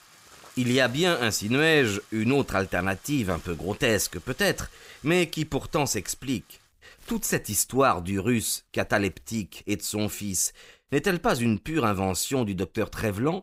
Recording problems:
household noises; faint; throughout; 25 dB below the speech

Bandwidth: 15.5 kHz